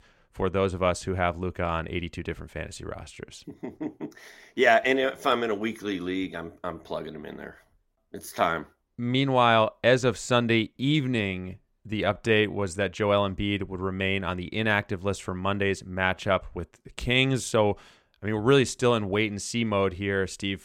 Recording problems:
uneven, jittery; strongly; from 2.5 to 17 s

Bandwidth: 16 kHz